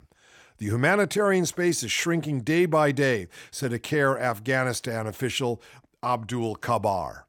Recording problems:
none

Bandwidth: 18.5 kHz